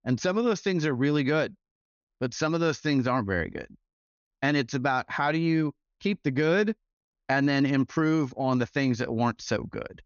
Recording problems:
high frequencies cut off; noticeable; nothing above 6.5 kHz

